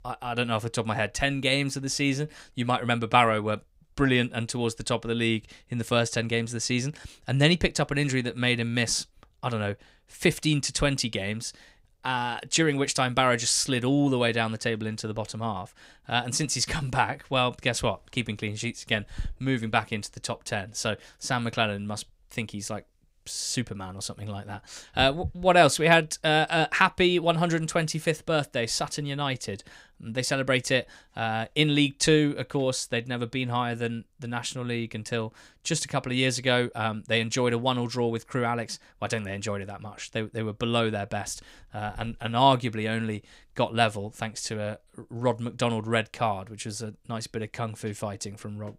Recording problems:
none

